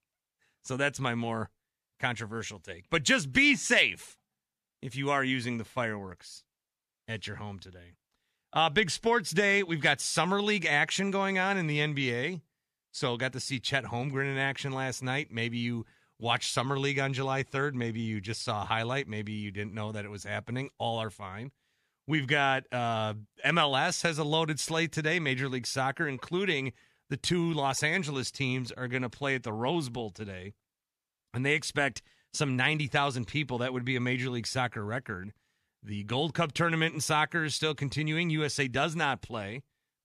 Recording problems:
none

